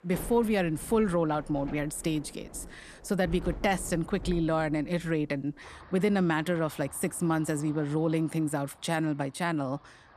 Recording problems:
rain or running water; noticeable; throughout; 15 dB below the speech

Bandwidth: 13.5 kHz